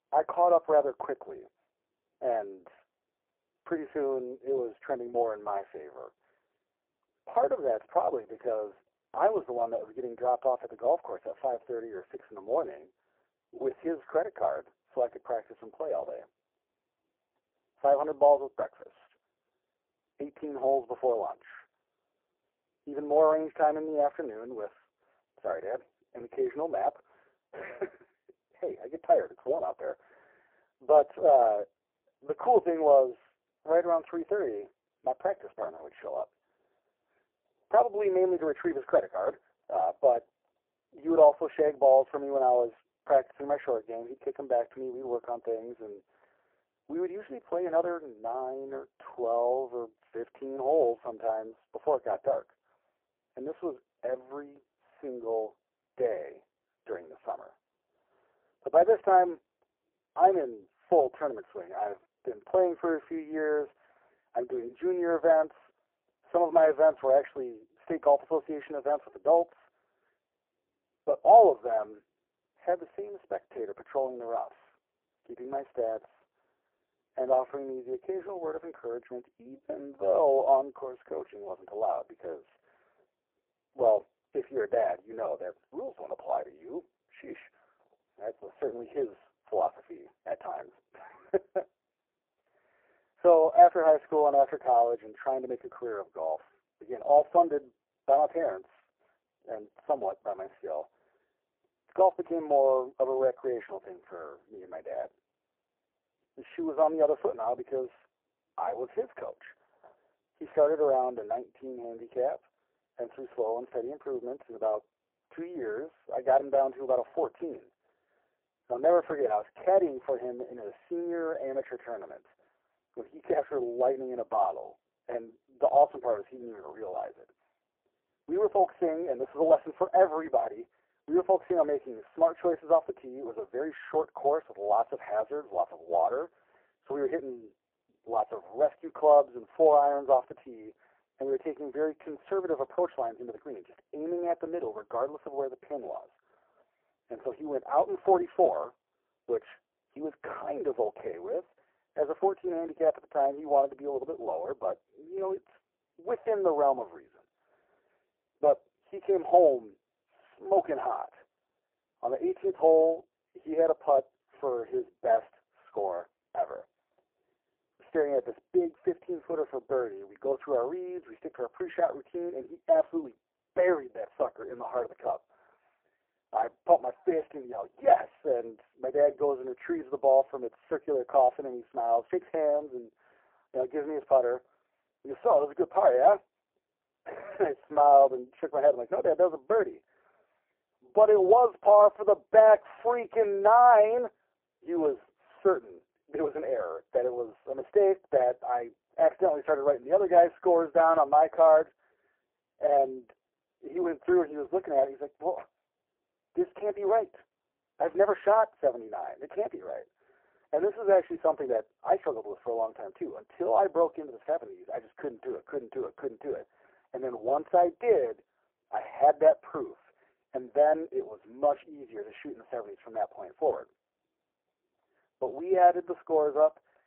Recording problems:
phone-call audio; poor line
muffled; very; fading above 2 kHz

